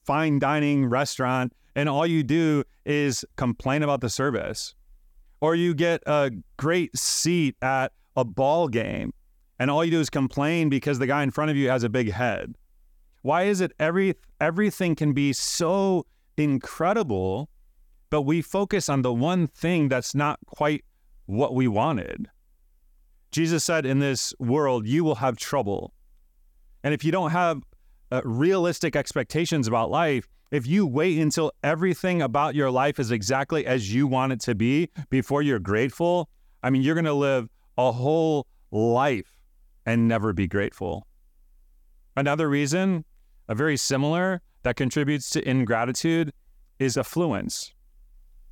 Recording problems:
none

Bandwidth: 18 kHz